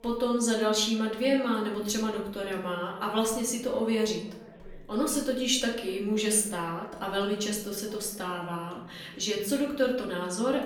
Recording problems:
off-mic speech; far
room echo; slight; dies away in 0.6 s
background chatter; faint; throughout; 2 voices, 25 dB below the speech

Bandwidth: 18.5 kHz